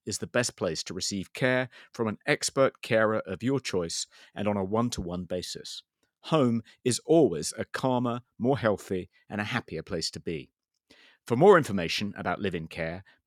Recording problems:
none

